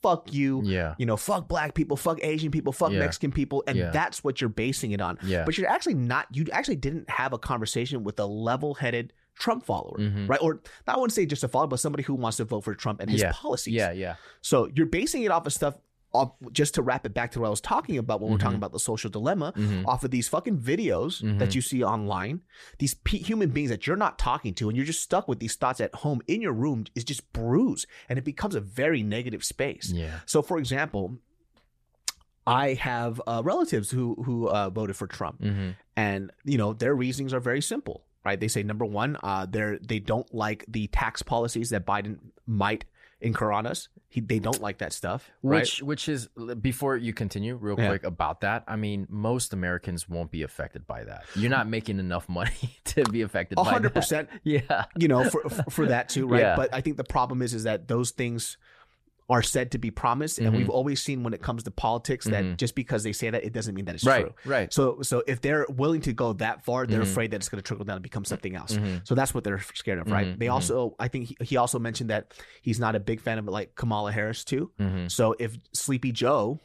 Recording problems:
none

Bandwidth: 14.5 kHz